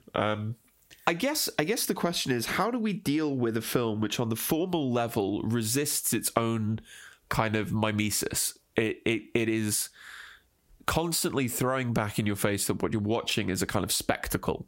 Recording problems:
squashed, flat; heavily

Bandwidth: 16 kHz